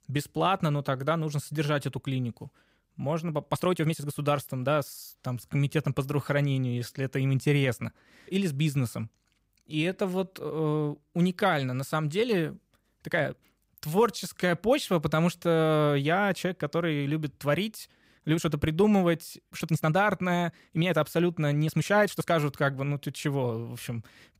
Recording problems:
uneven, jittery; strongly; from 1 to 22 s

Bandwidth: 15.5 kHz